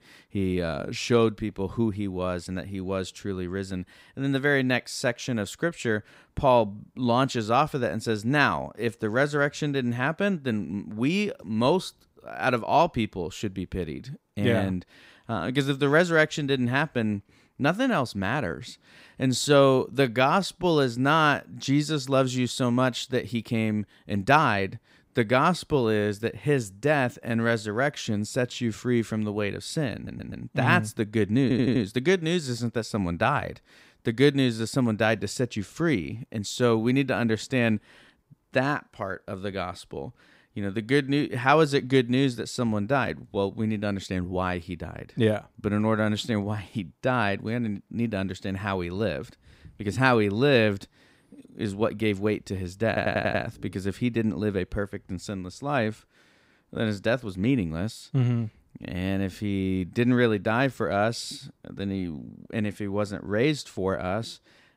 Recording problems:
audio stuttering; at 30 s, at 31 s and at 53 s

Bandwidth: 15.5 kHz